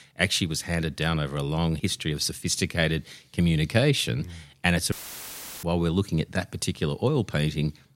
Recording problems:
audio cutting out; filled with static; at 5 s for 0.5 s

